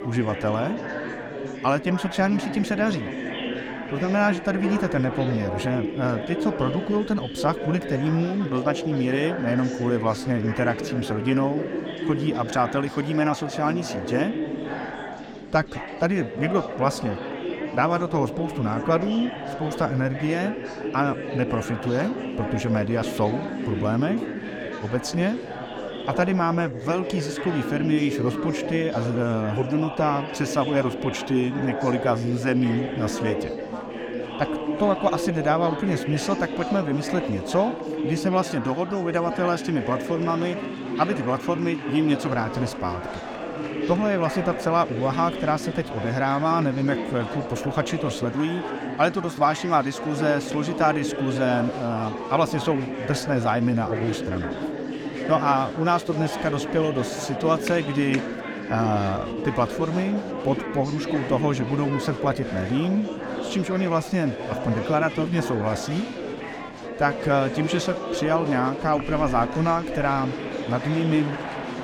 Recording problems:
chatter from many people; loud; throughout; 6 dB below the speech

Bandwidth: 18 kHz